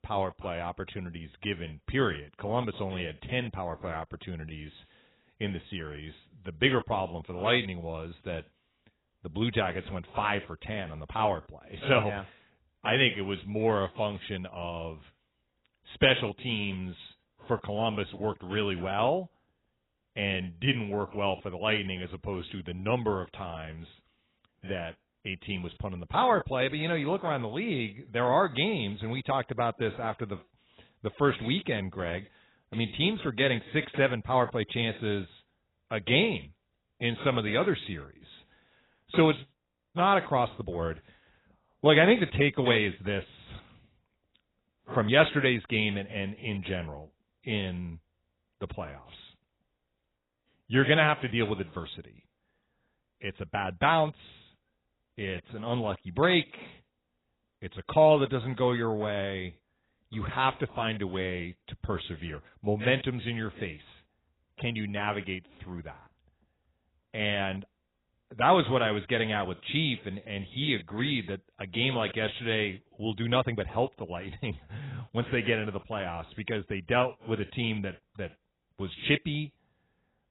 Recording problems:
garbled, watery; badly; nothing above 4 kHz

